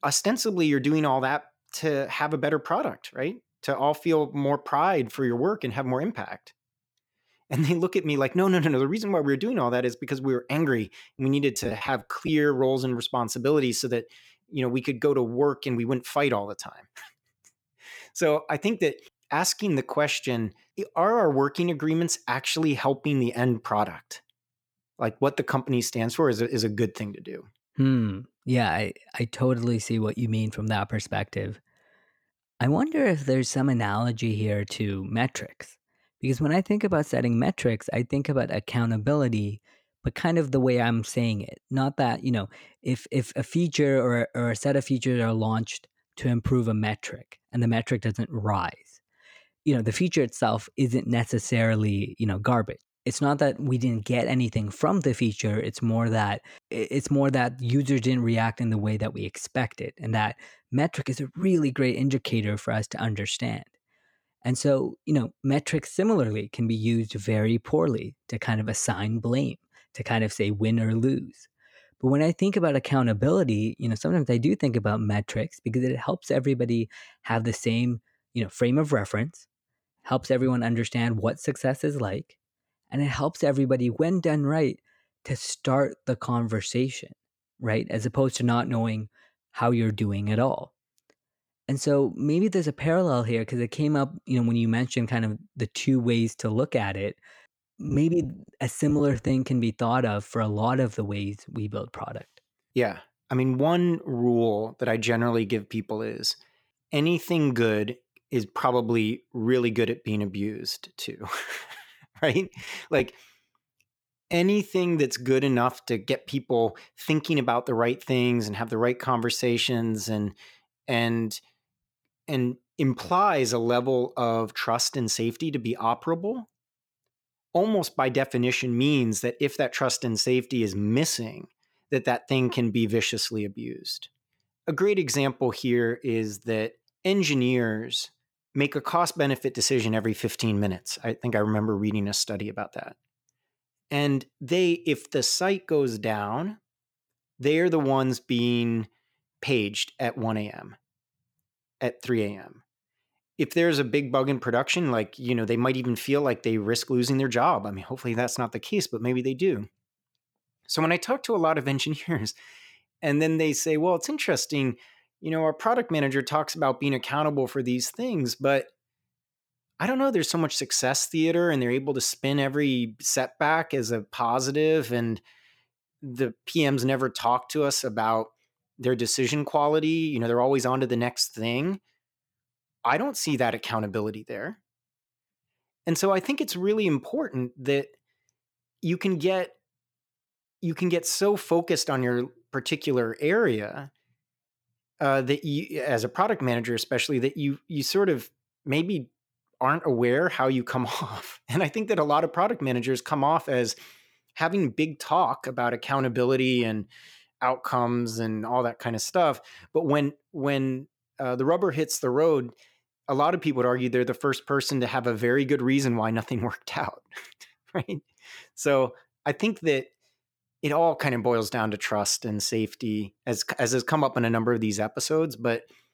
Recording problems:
choppy; very; from 11 to 12 s, from 1:38 to 1:39 and from 1:52 to 1:54; 9% of the speech affected

